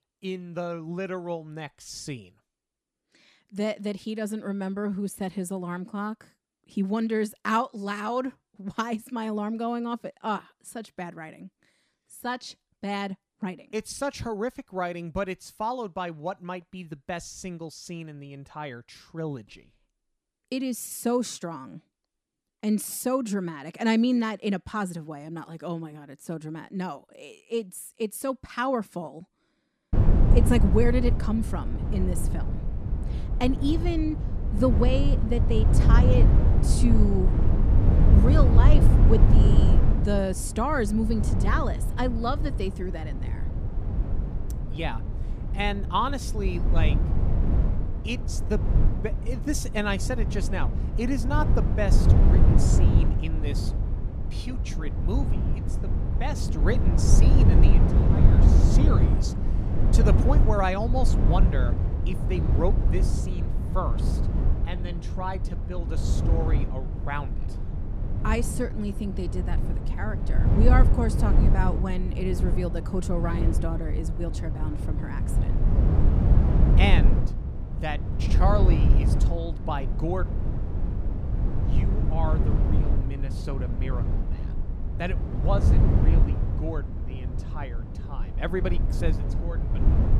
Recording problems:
low rumble; loud; from 30 s on; 5 dB below the speech

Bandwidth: 14.5 kHz